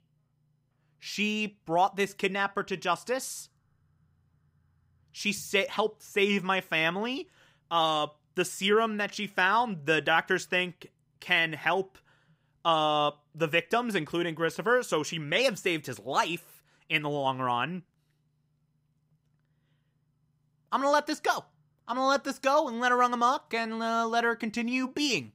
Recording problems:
none

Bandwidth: 15.5 kHz